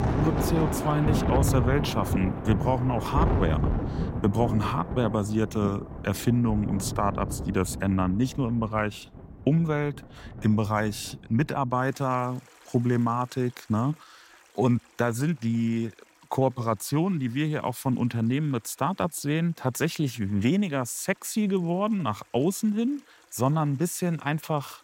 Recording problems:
rain or running water; loud; throughout; 3 dB below the speech

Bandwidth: 16 kHz